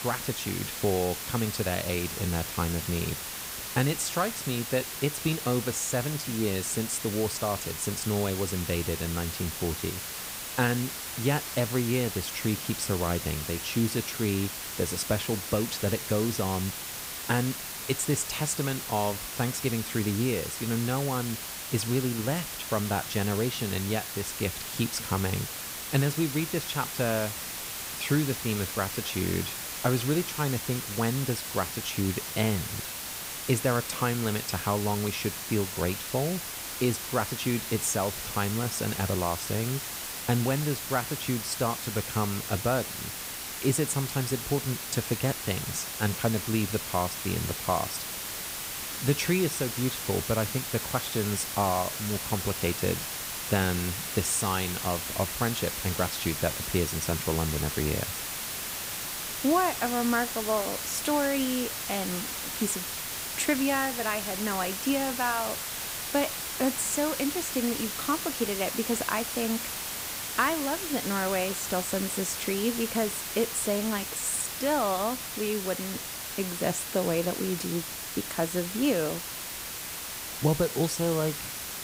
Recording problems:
hiss; loud; throughout; 3 dB below the speech

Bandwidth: 15.5 kHz